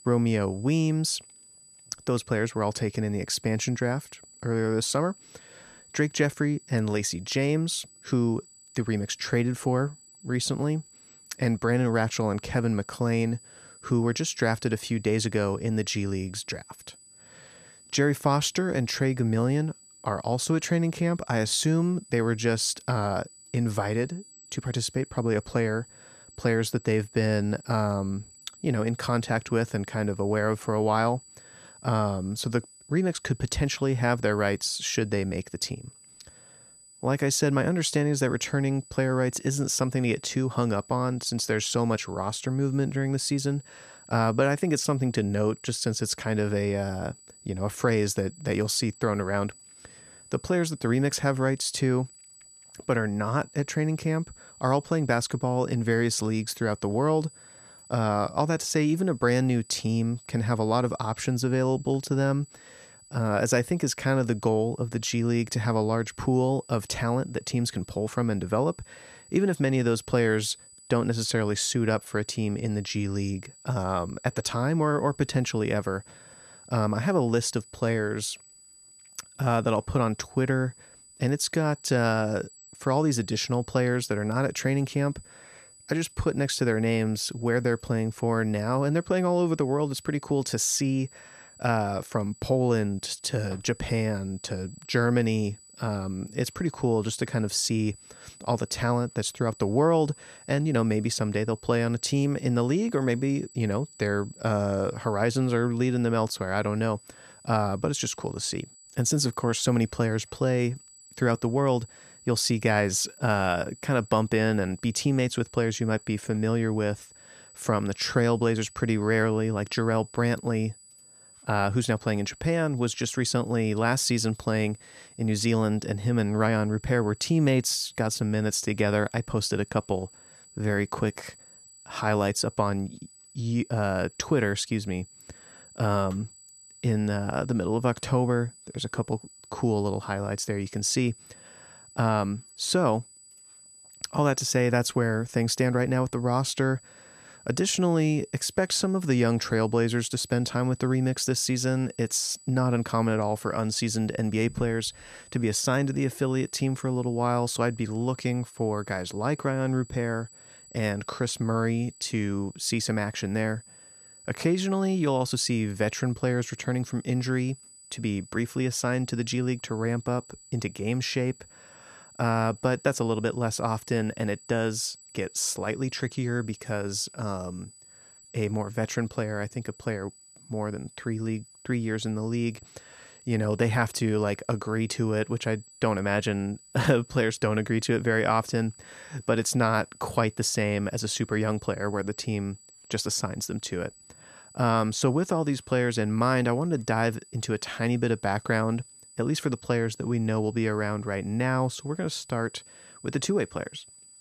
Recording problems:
high-pitched whine; faint; throughout; 8 kHz, 25 dB below the speech

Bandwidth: 14.5 kHz